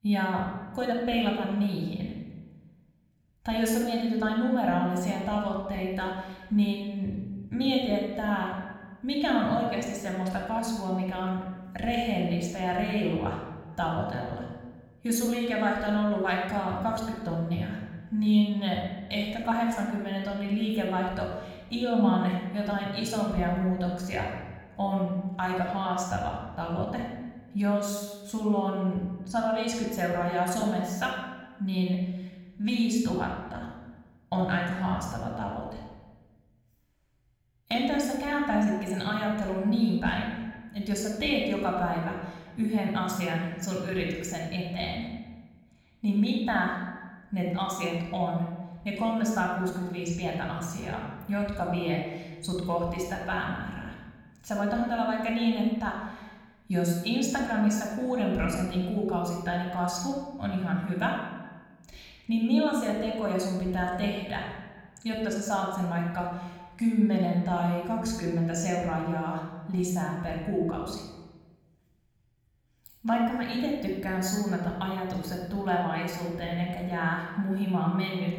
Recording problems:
room echo; noticeable; dies away in 1 s
echo of what is said; faint; throughout; 200 ms later, 25 dB below the speech
off-mic speech; somewhat distant

